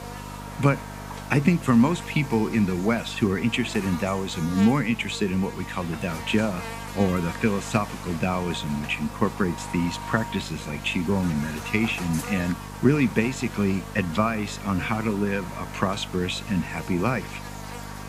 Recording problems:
electrical hum; loud; throughout; 50 Hz, 9 dB below the speech

